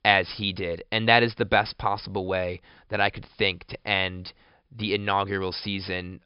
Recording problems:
high frequencies cut off; noticeable; nothing above 5.5 kHz

